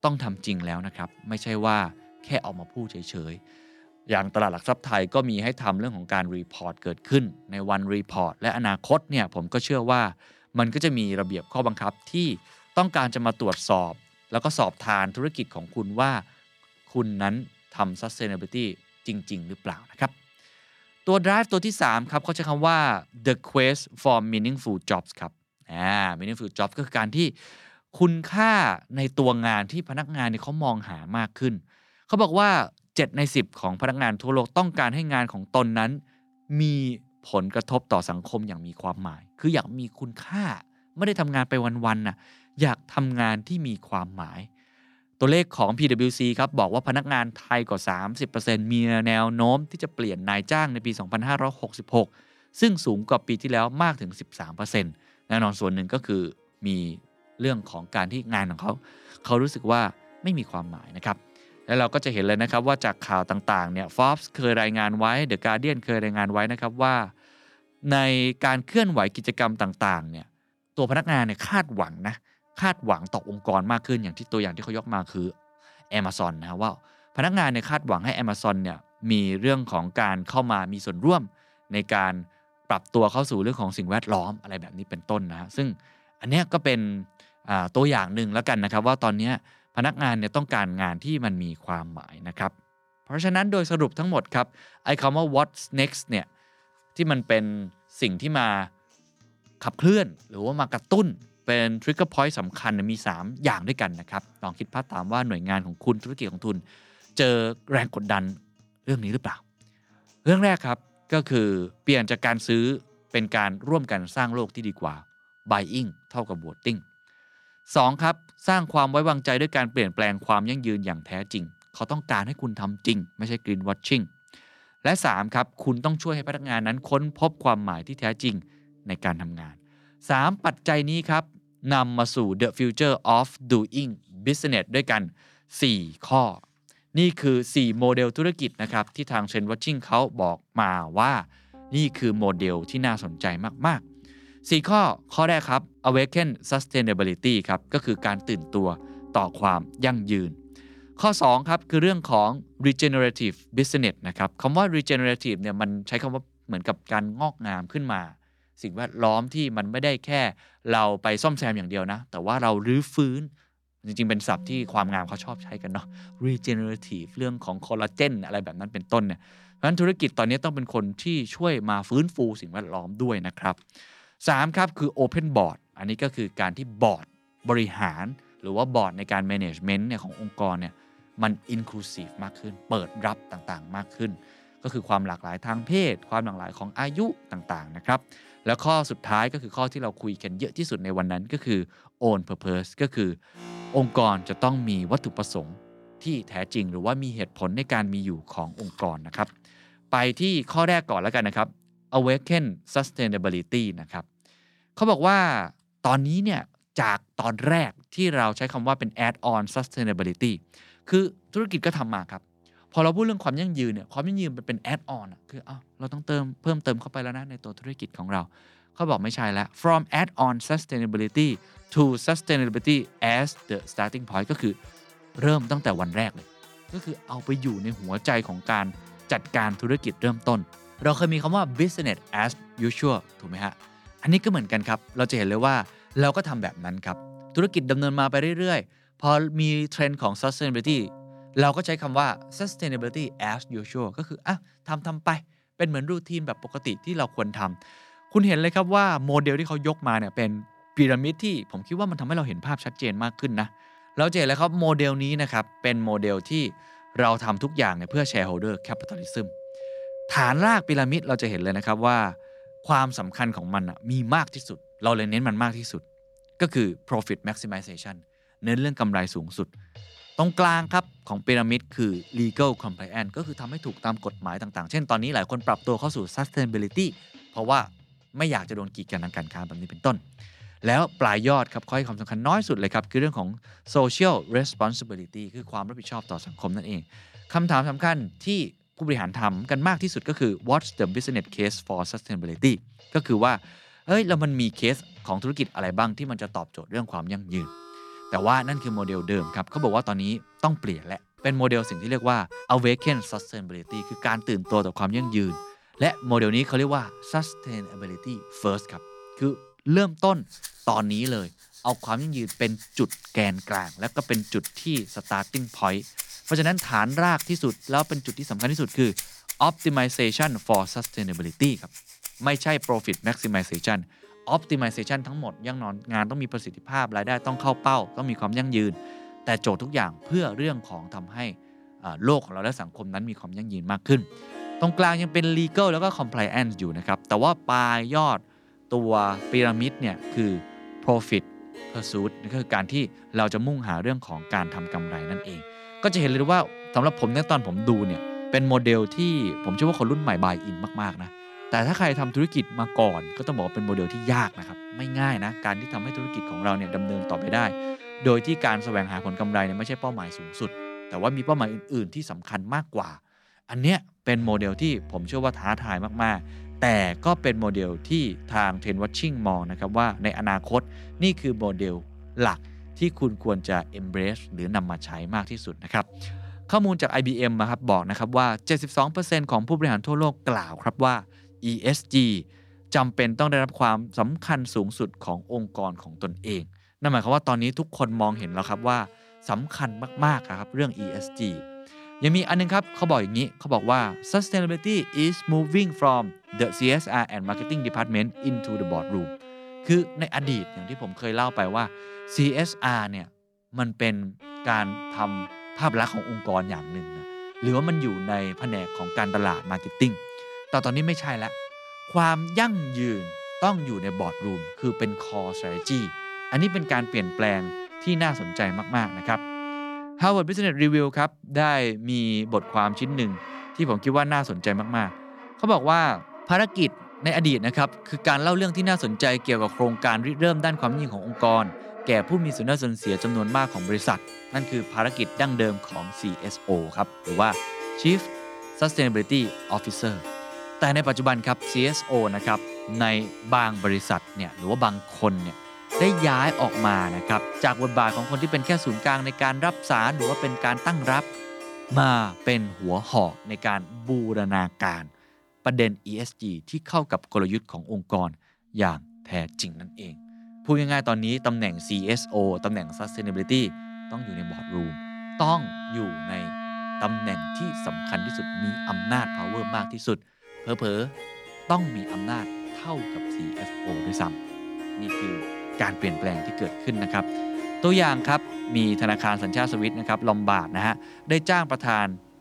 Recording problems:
background music; noticeable; throughout; 15 dB below the speech

